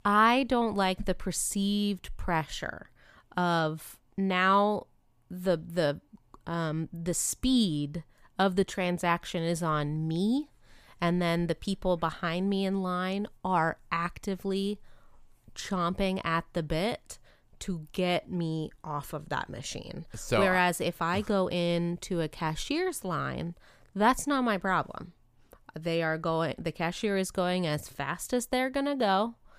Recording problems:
none

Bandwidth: 15 kHz